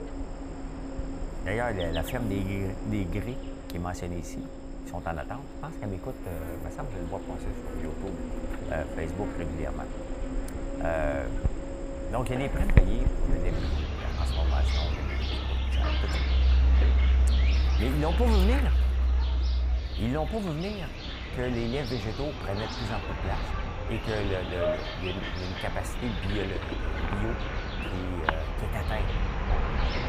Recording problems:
animal sounds; very loud; throughout; 4 dB above the speech

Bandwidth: 15 kHz